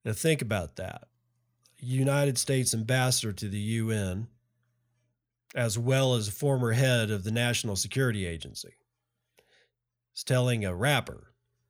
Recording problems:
none

